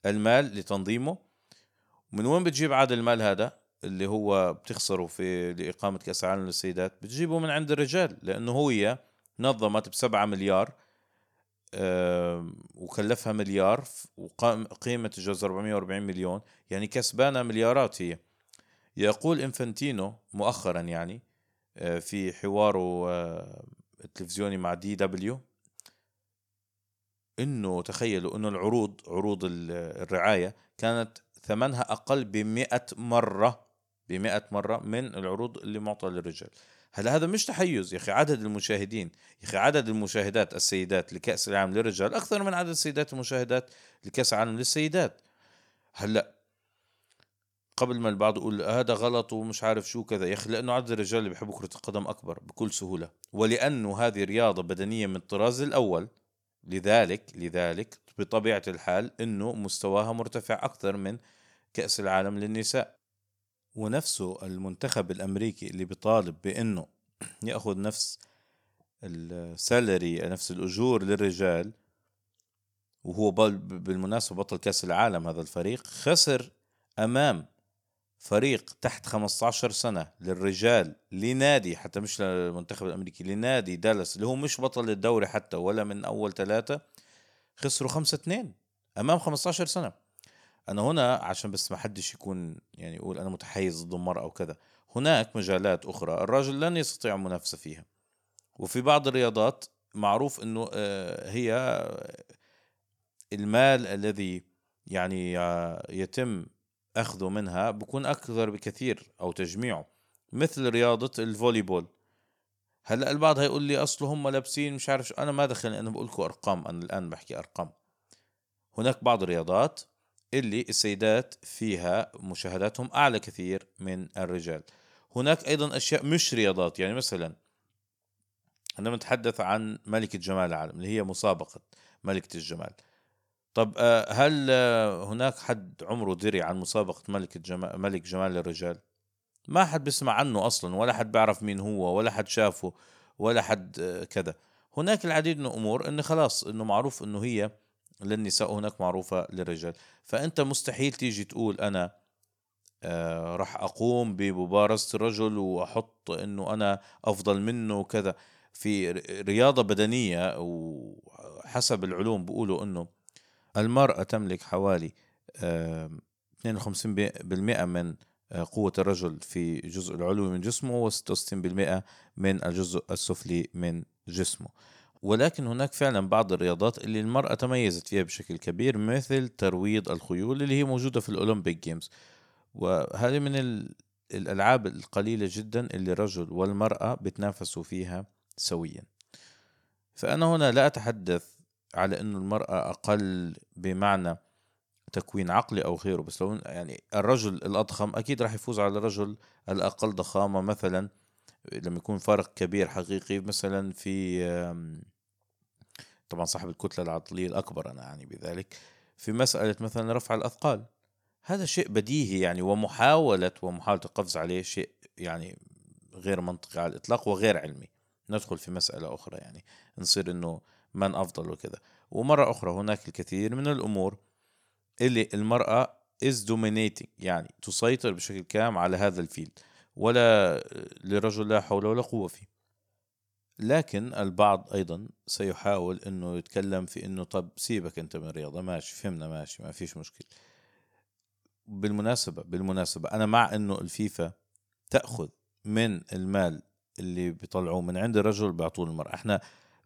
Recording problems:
none

